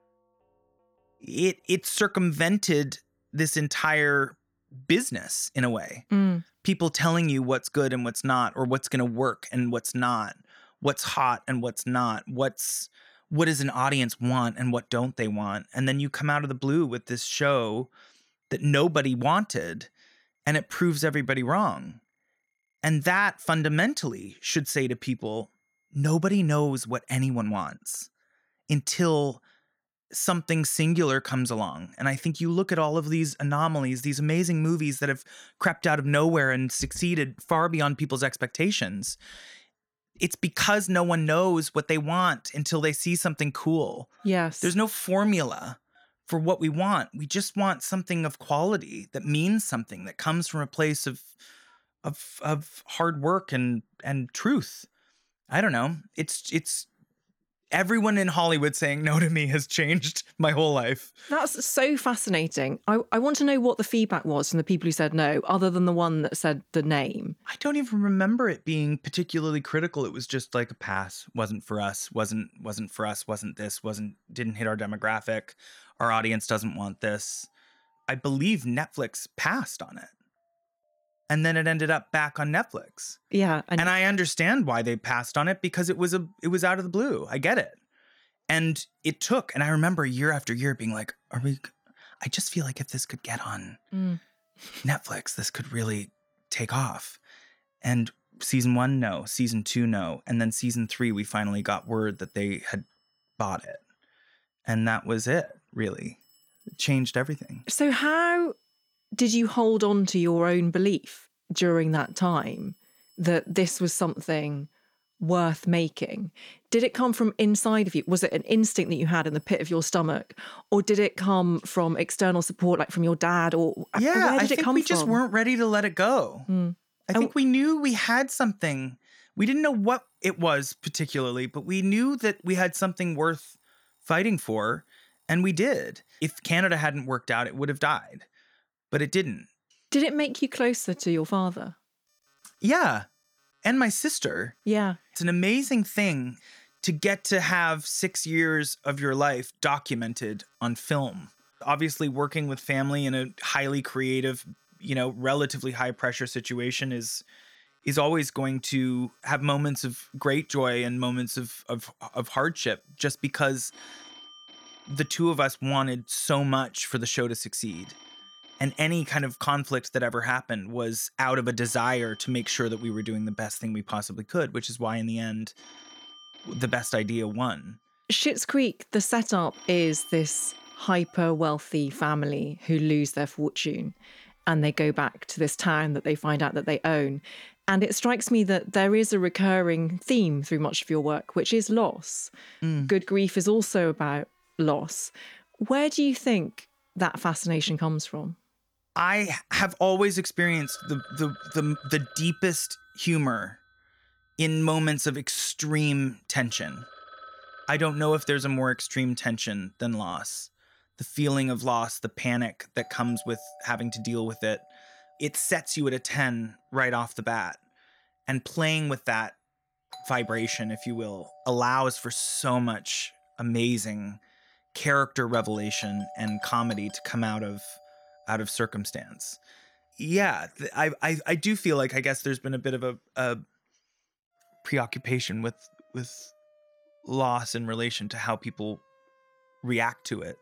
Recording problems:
alarms or sirens; faint; throughout; 25 dB below the speech

